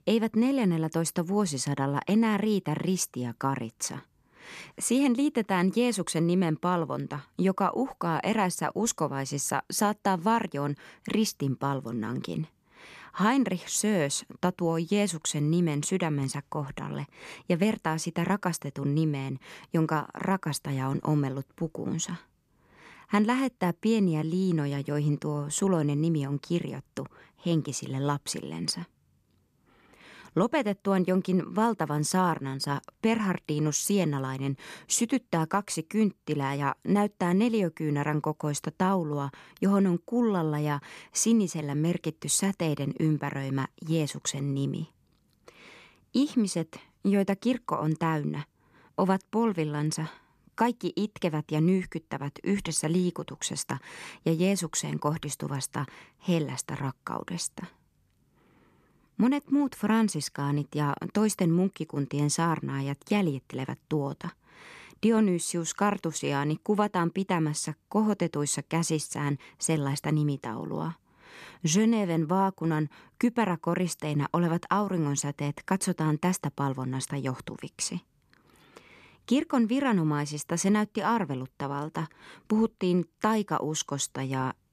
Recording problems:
none

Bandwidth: 13.5 kHz